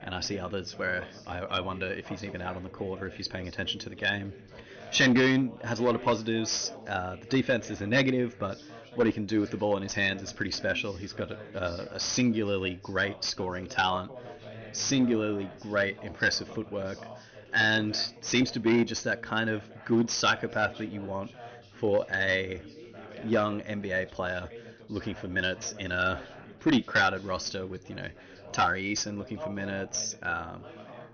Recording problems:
high frequencies cut off; noticeable; nothing above 6.5 kHz
distortion; slight; 3% of the sound clipped
background chatter; noticeable; throughout; 3 voices, 15 dB below the speech

